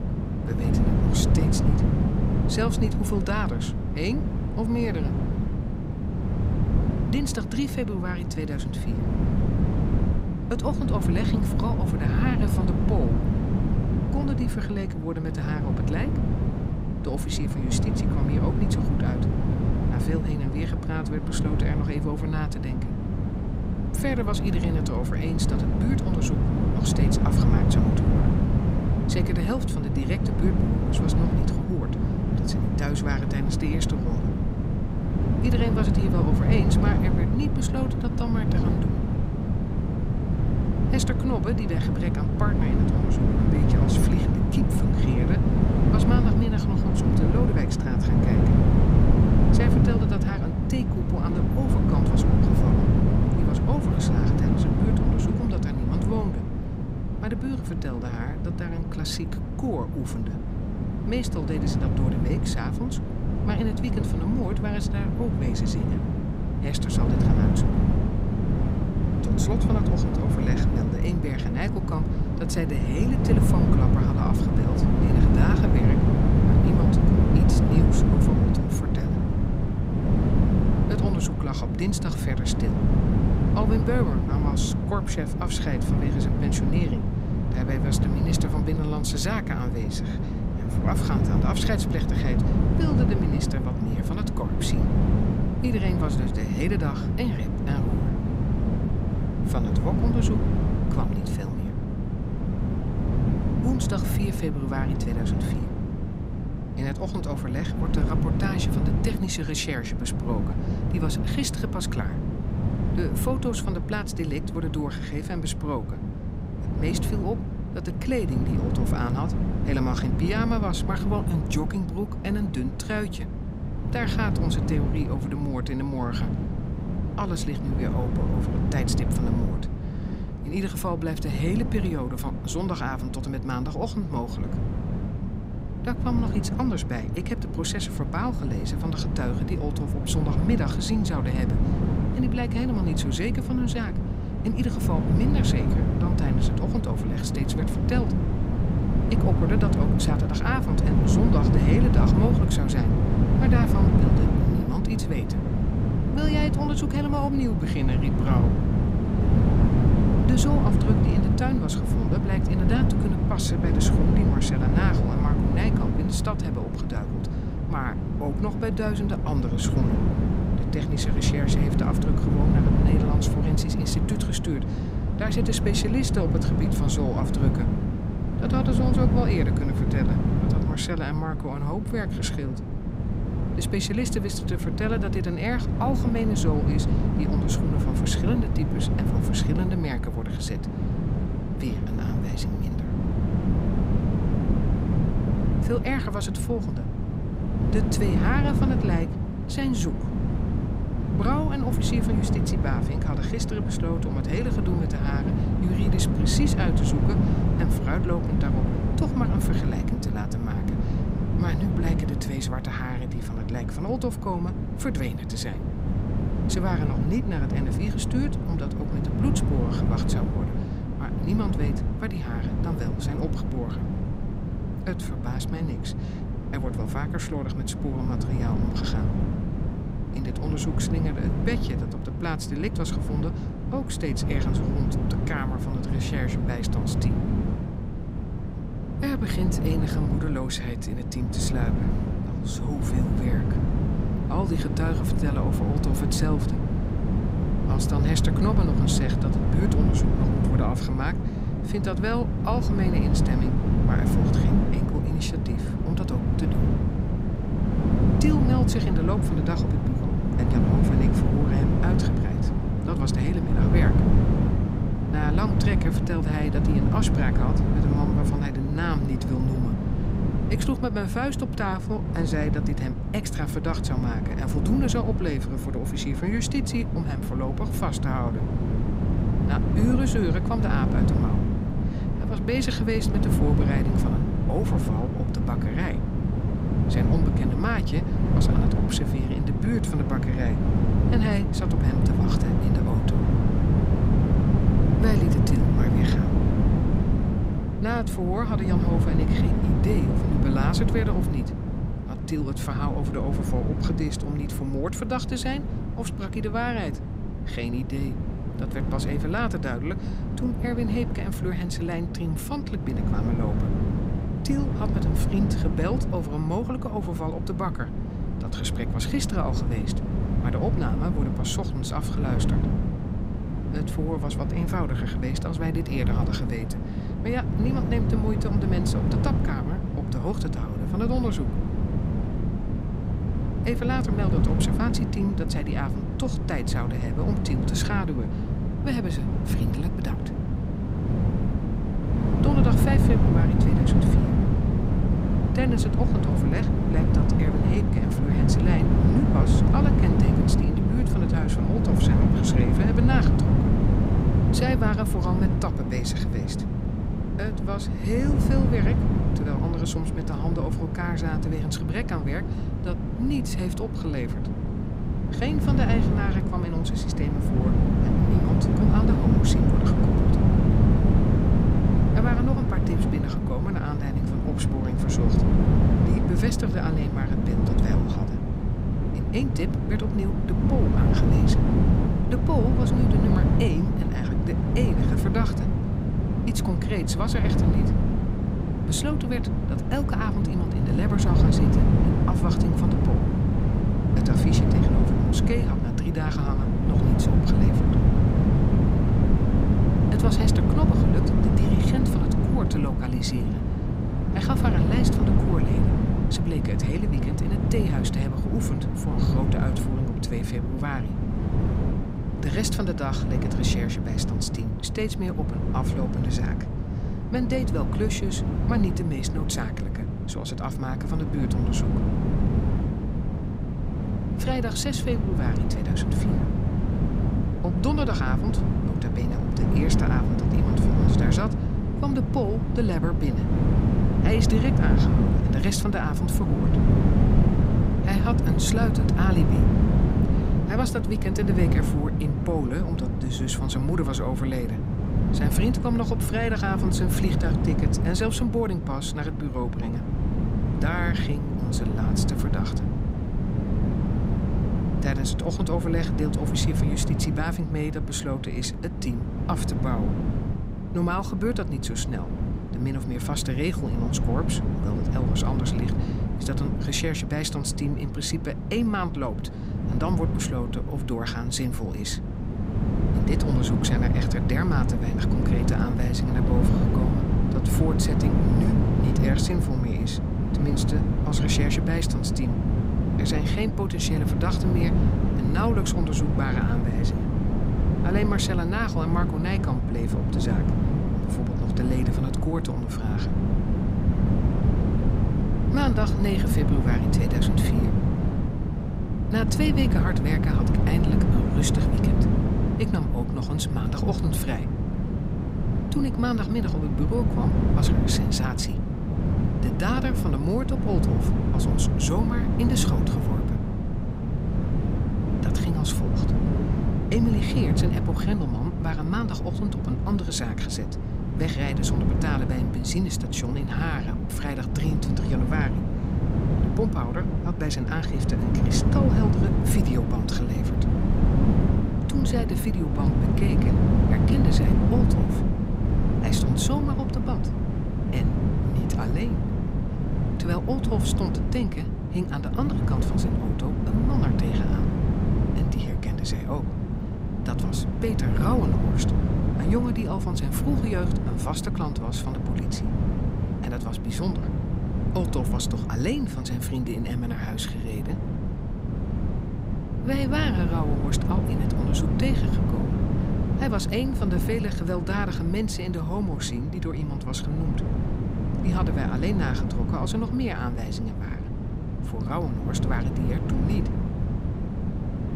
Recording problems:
wind noise on the microphone; heavy; as loud as the speech

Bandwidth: 15.5 kHz